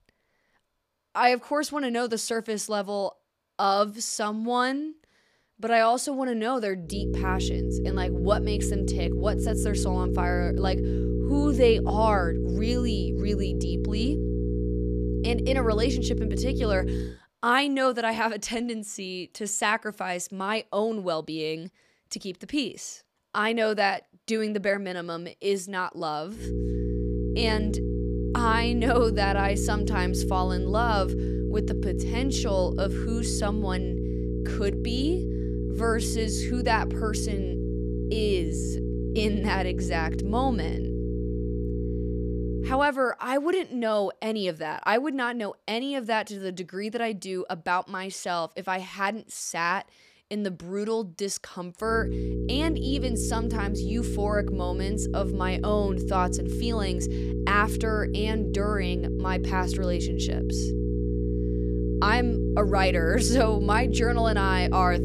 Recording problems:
electrical hum; loud; from 7 to 17 s, from 26 to 43 s and from 52 s on; 60 Hz, 7 dB below the speech

